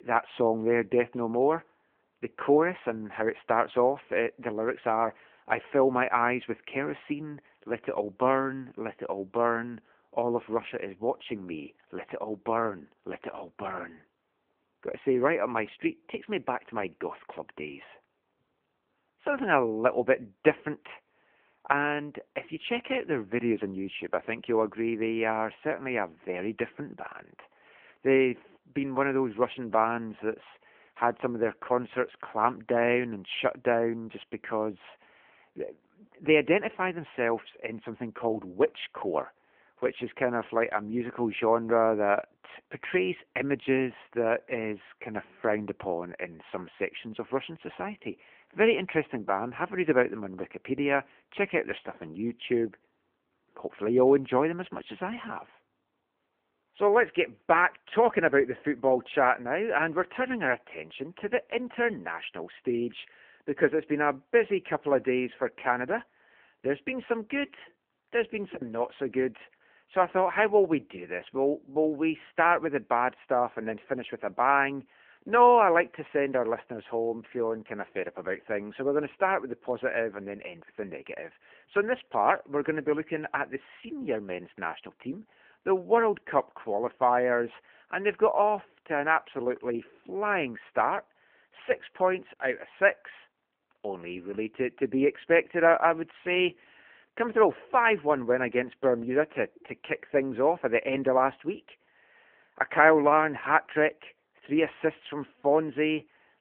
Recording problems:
phone-call audio

